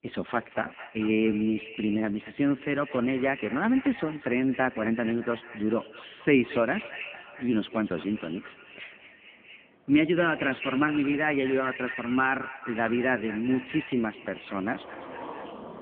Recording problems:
phone-call audio; poor line
echo of what is said; noticeable; throughout; 220 ms later, 15 dB below the speech
traffic noise; faint; throughout; 20 dB below the speech

